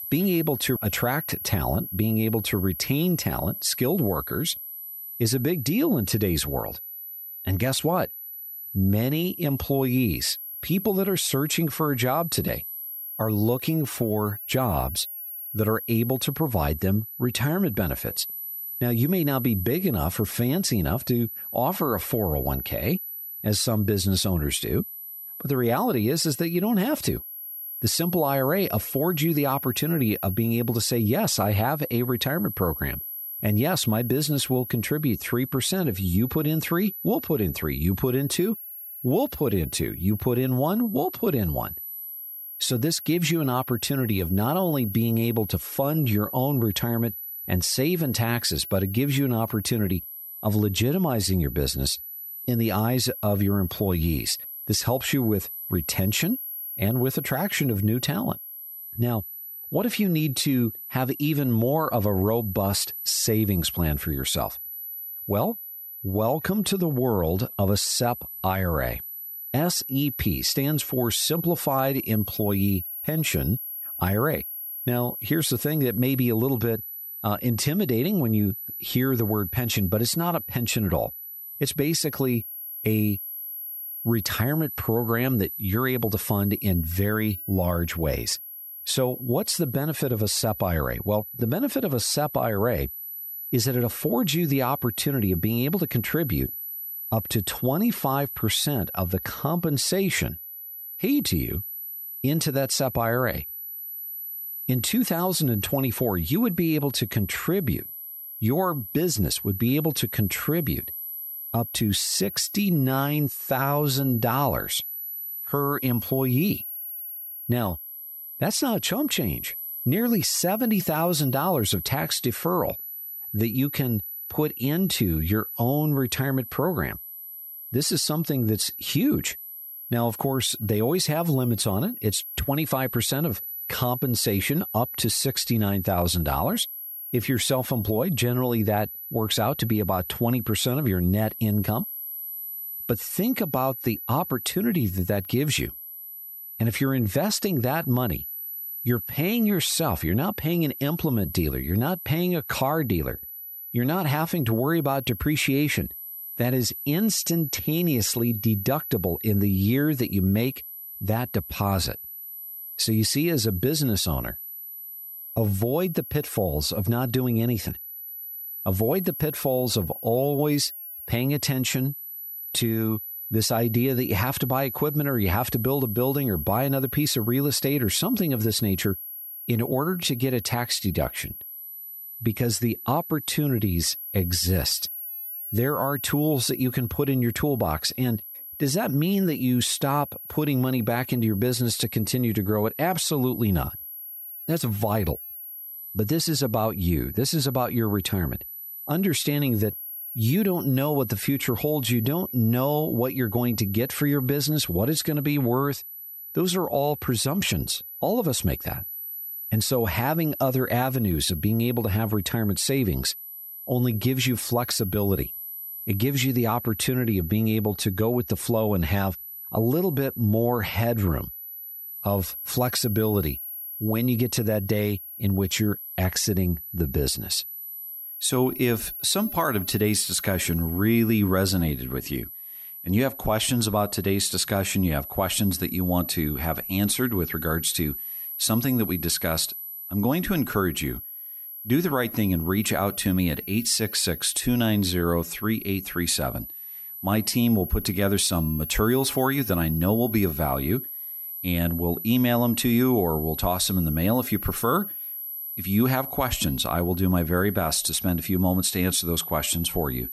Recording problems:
high-pitched whine; loud; throughout; 11.5 kHz, 8 dB below the speech

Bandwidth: 14.5 kHz